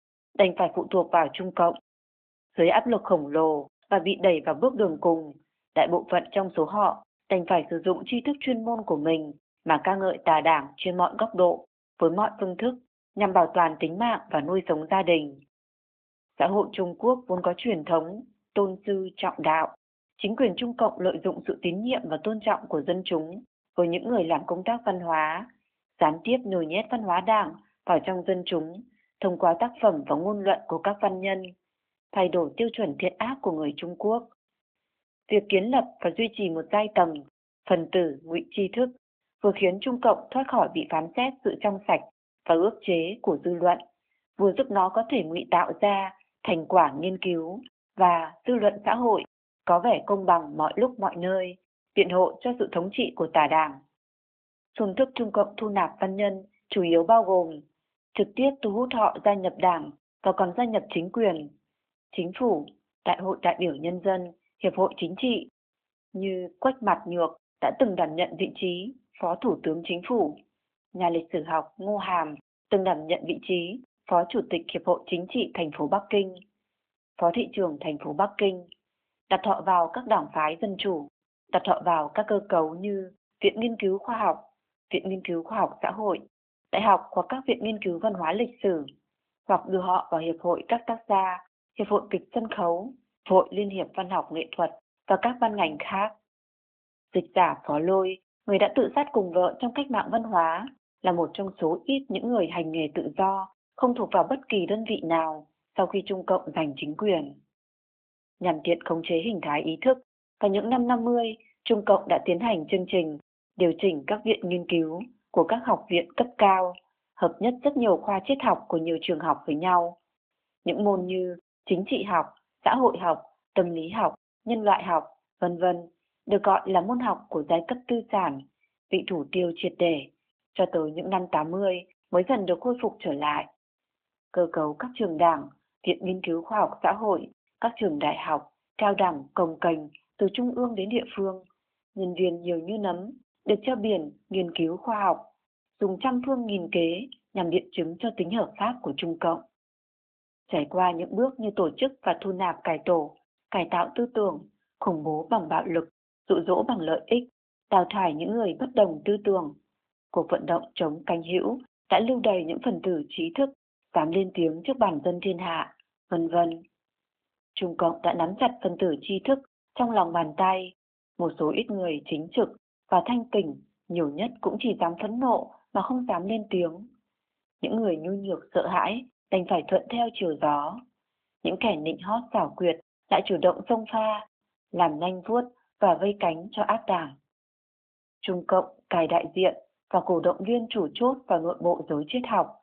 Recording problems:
phone-call audio; nothing above 3.5 kHz

